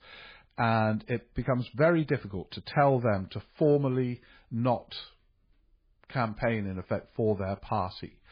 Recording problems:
garbled, watery; badly; nothing above 4.5 kHz

